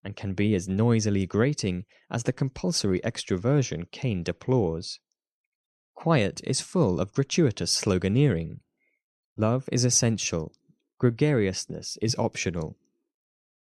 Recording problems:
none

